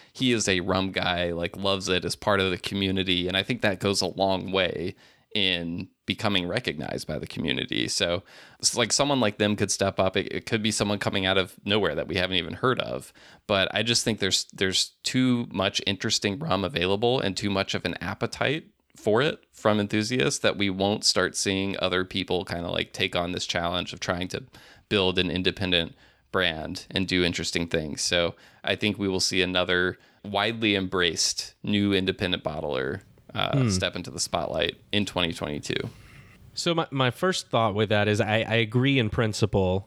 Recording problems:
none

